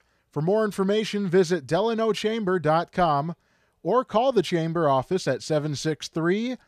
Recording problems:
none

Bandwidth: 14.5 kHz